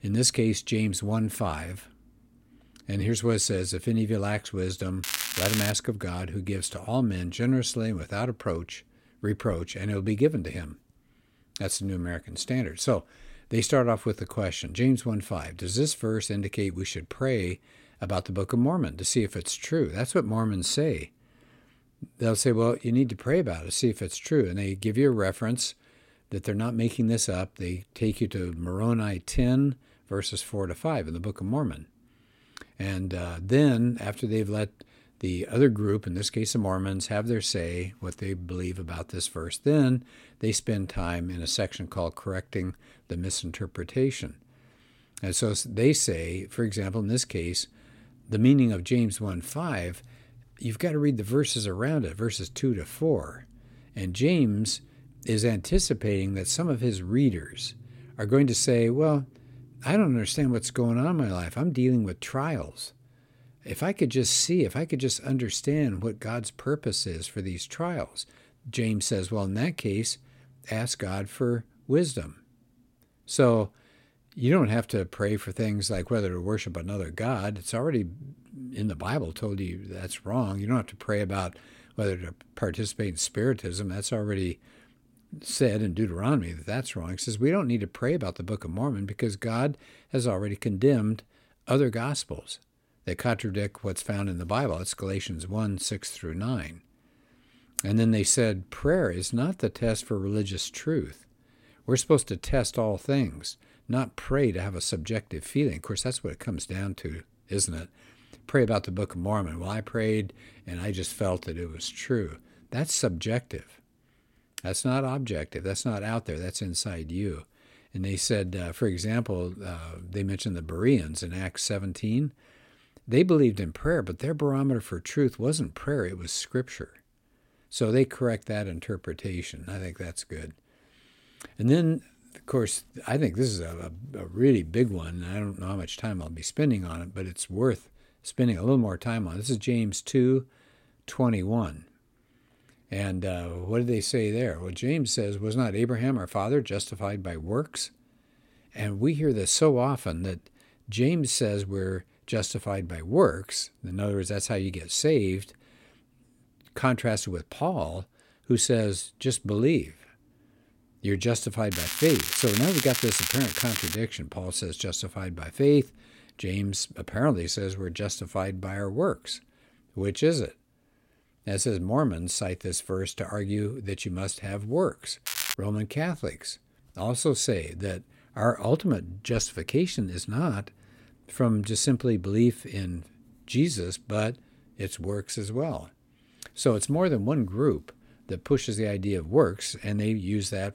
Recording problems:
crackling; loud; at 5 s, from 2:42 to 2:44 and at 2:55; 1 dB below the speech

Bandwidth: 16.5 kHz